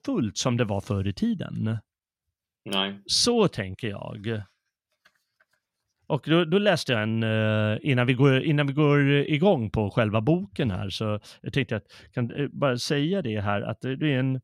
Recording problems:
none

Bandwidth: 16.5 kHz